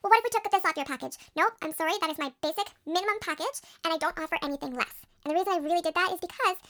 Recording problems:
wrong speed and pitch; too fast and too high; 1.5 times normal speed

